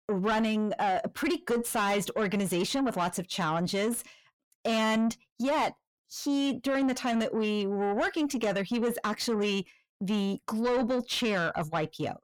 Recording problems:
distortion; slight; 10 dB below the speech

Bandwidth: 17.5 kHz